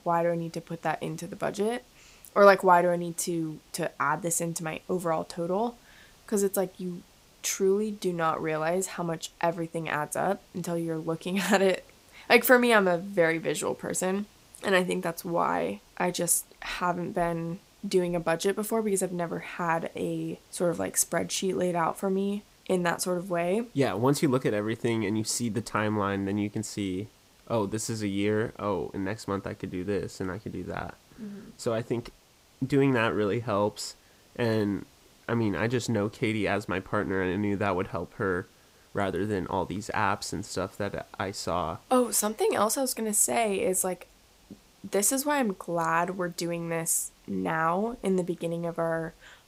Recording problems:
hiss; faint; throughout; 30 dB below the speech

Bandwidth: 15.5 kHz